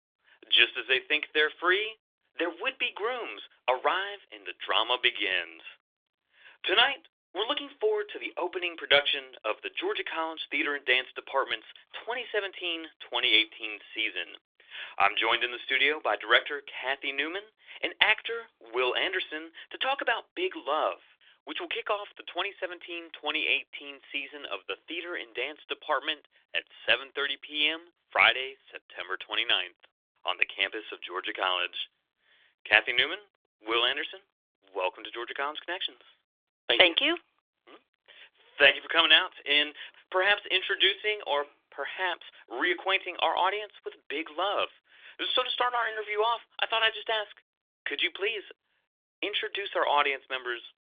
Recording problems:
thin; very; fading below 900 Hz
phone-call audio; nothing above 3.5 kHz

